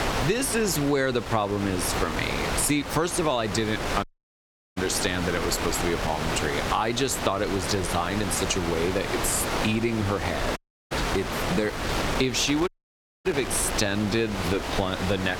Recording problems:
squashed, flat; heavily
wind noise on the microphone; heavy; 3 dB below the speech
audio cutting out; at 4 s for 0.5 s, at 11 s and at 13 s for 0.5 s

